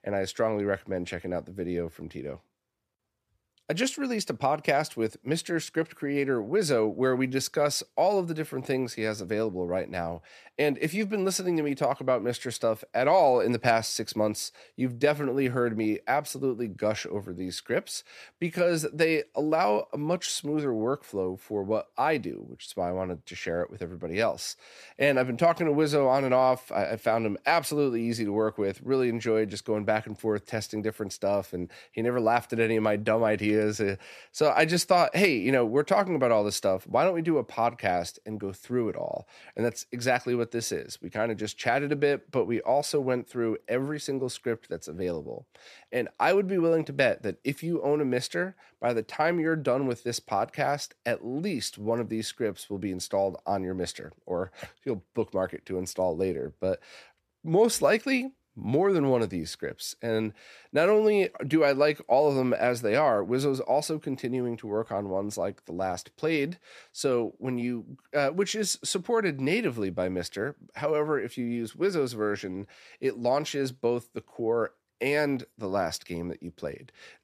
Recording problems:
none

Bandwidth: 14.5 kHz